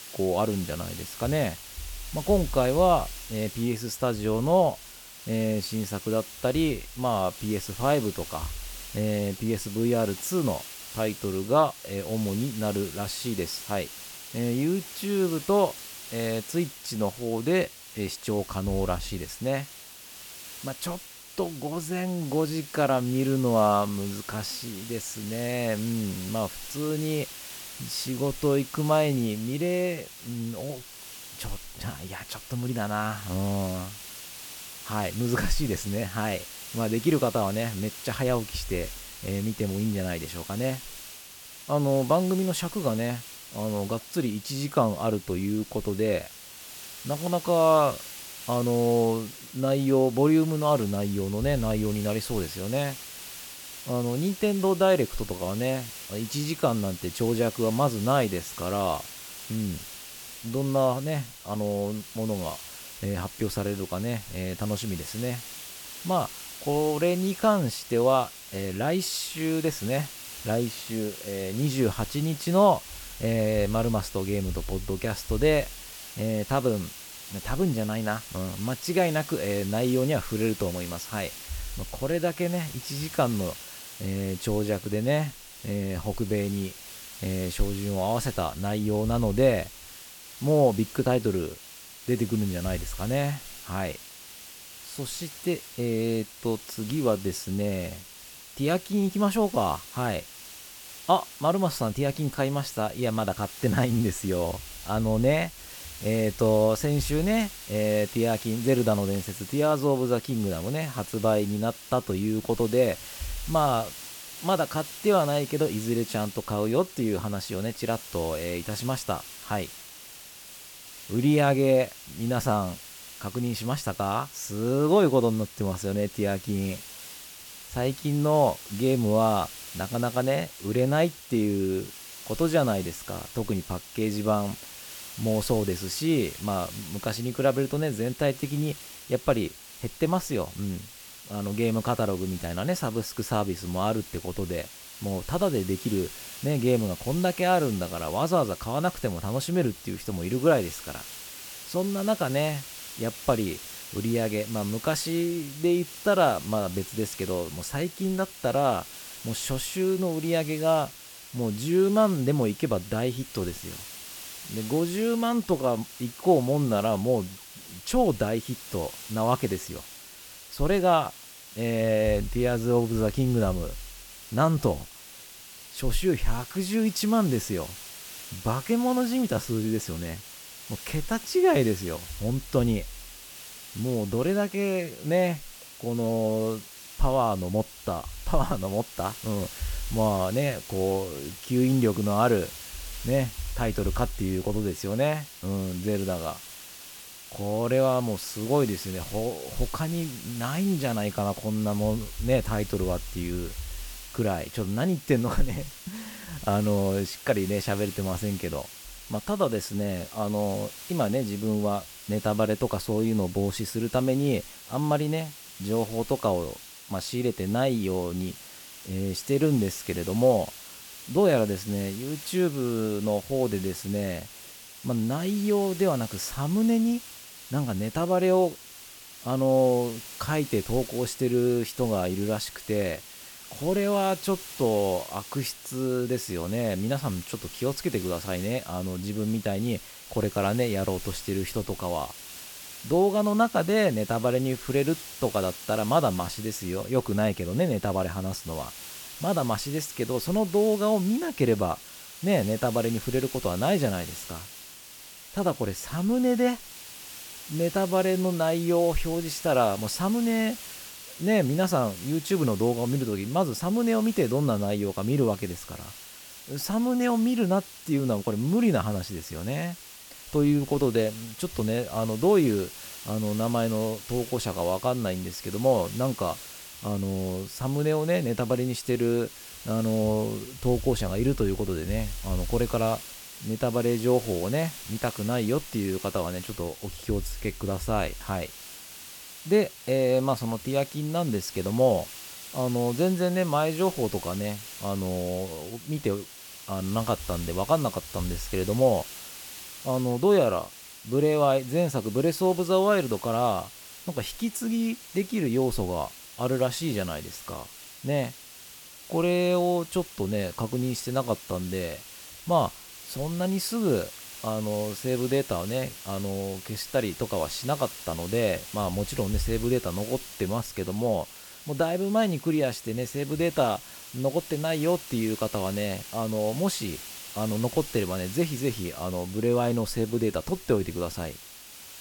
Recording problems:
hiss; noticeable; throughout; 15 dB below the speech

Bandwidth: 18 kHz